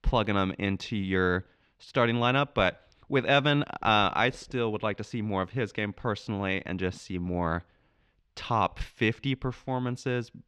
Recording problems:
muffled; slightly; fading above 3 kHz

